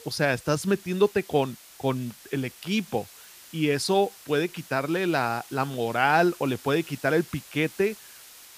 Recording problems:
hiss; noticeable; throughout; 20 dB below the speech

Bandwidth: 15 kHz